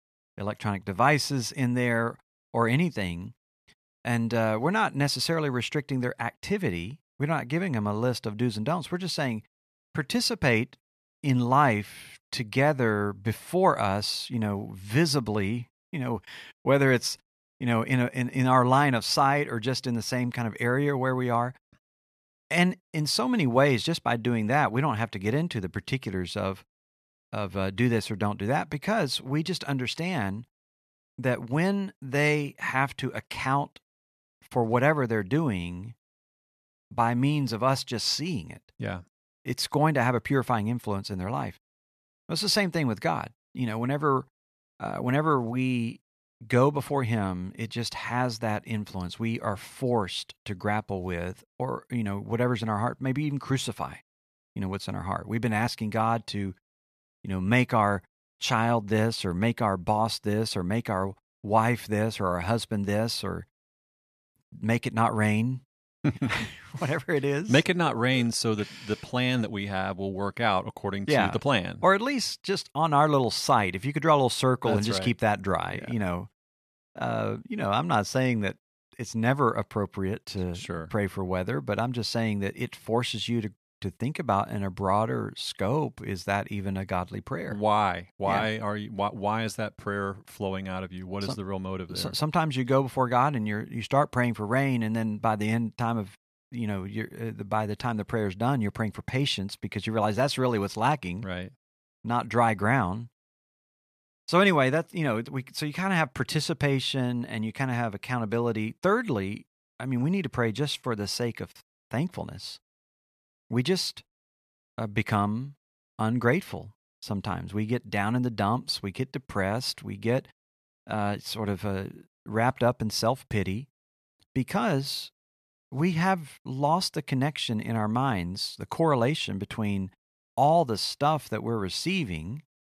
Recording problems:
none

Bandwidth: 14 kHz